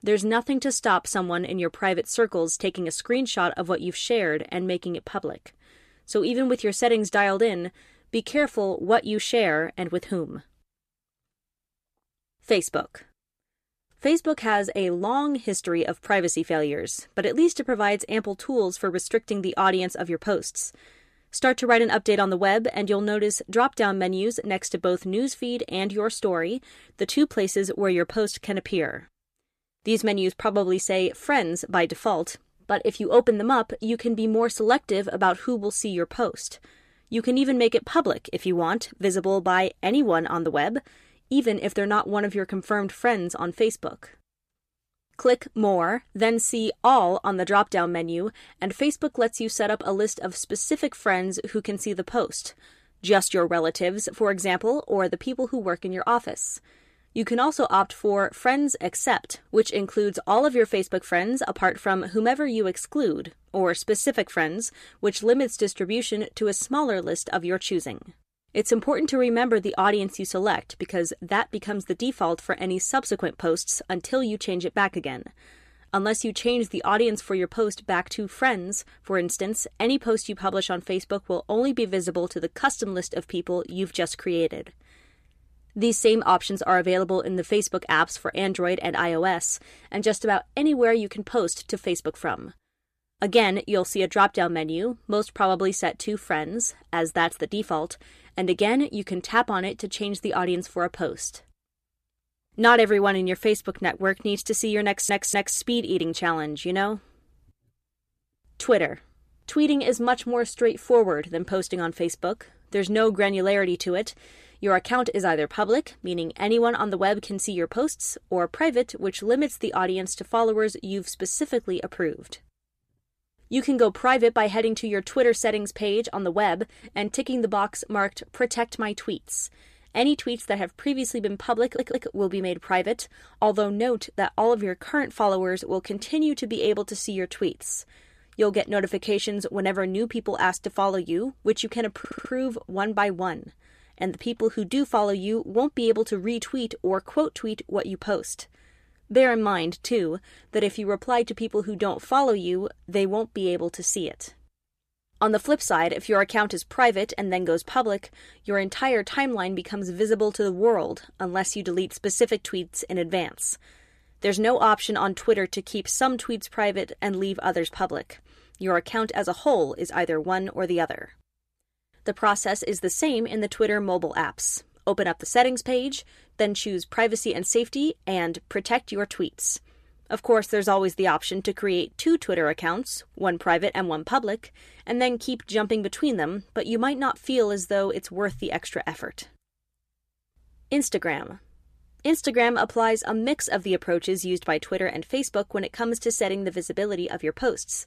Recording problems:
audio stuttering; at 1:45, at 2:12 and at 2:22

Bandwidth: 14.5 kHz